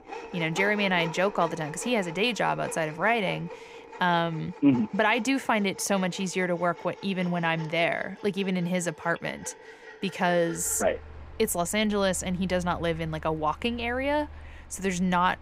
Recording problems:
machinery noise; noticeable; throughout; 15 dB below the speech

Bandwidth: 15.5 kHz